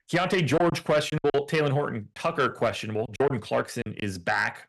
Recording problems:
distortion; slight; 10 dB below the speech
choppy; very; 7% of the speech affected

